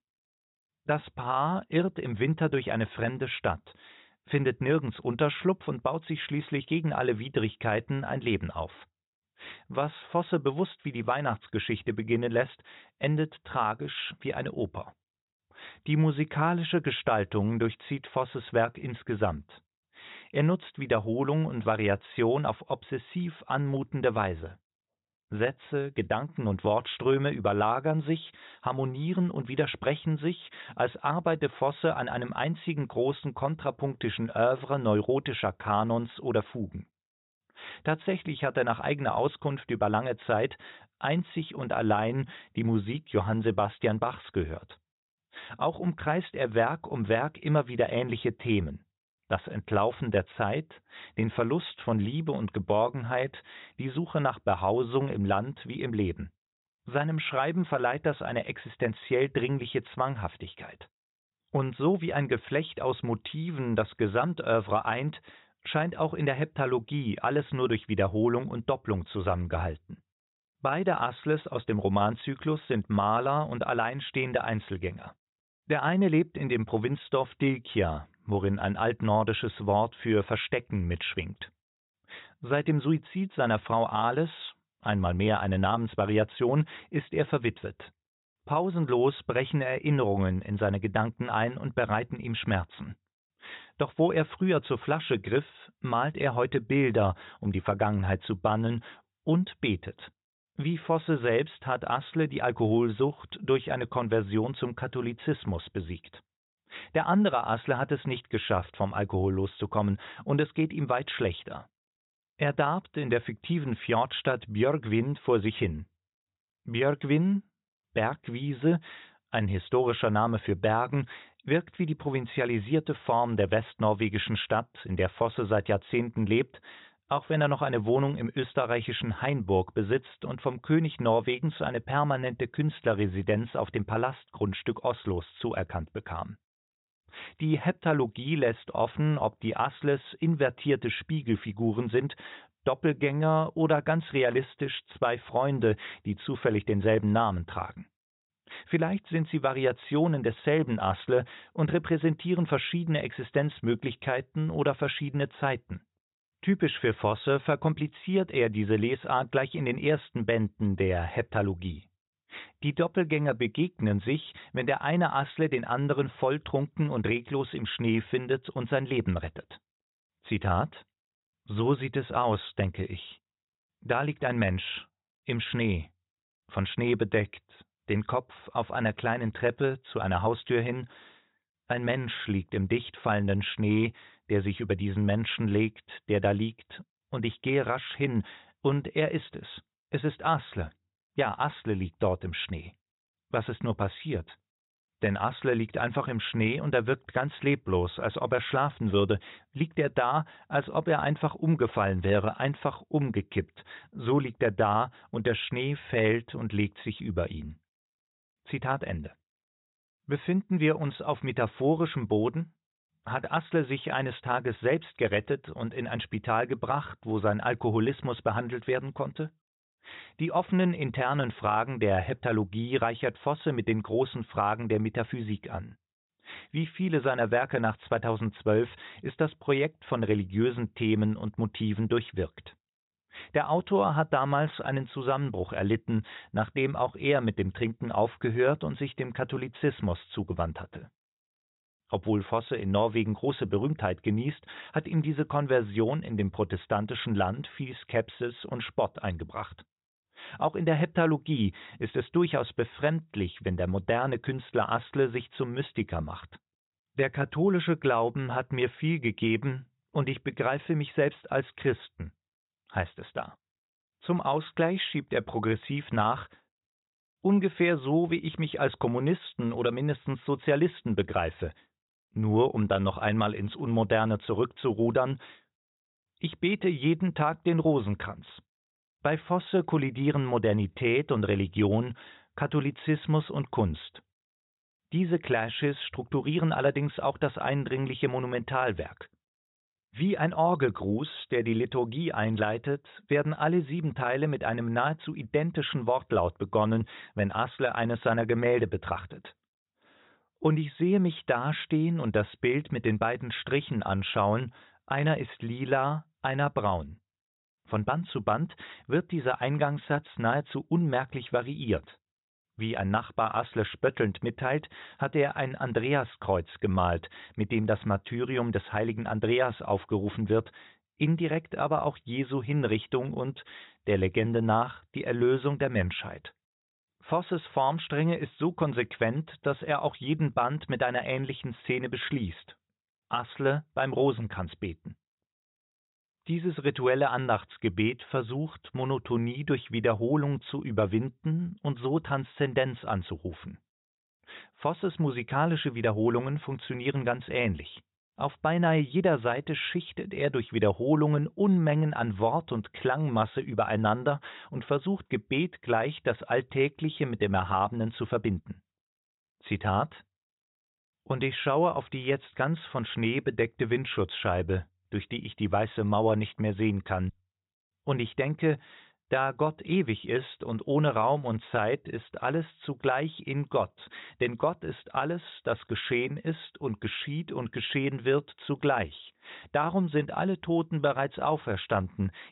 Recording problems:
high frequencies cut off; severe; nothing above 4 kHz

